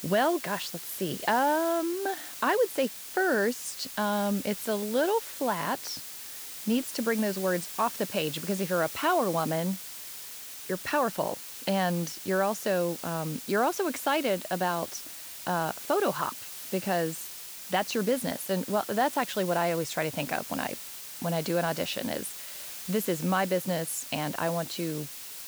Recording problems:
hiss; loud; throughout; 9 dB below the speech

